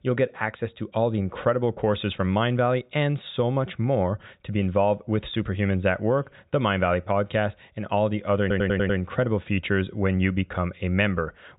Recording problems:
high frequencies cut off; severe; nothing above 4 kHz
audio stuttering; at 8.5 s

